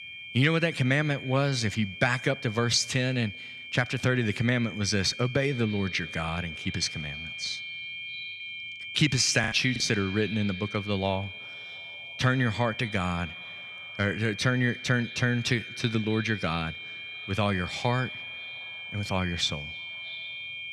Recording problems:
echo of what is said; faint; from 5.5 s on; 310 ms later, 20 dB below the speech
high-pitched whine; noticeable; throughout; 2.5 kHz, 10 dB below the speech
choppy; very; at 9.5 s; 13% of the speech affected

